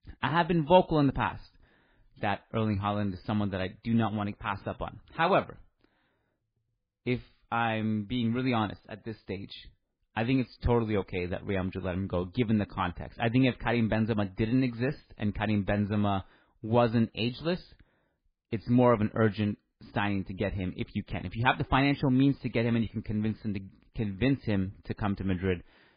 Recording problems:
garbled, watery; badly; nothing above 4 kHz

